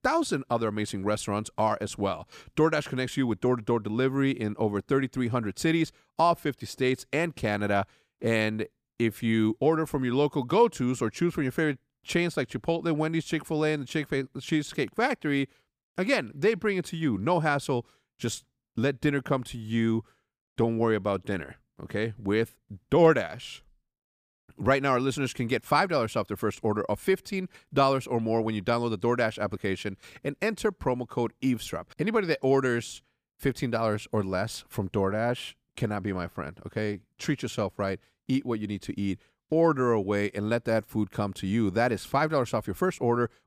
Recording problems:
none

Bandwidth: 15 kHz